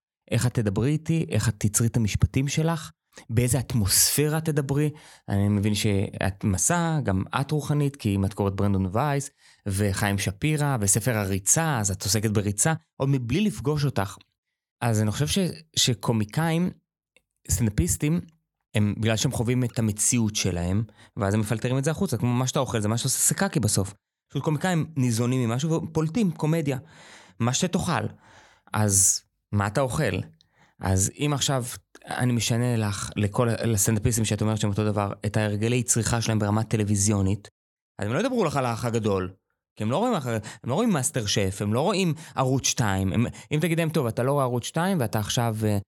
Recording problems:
none

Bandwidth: 17 kHz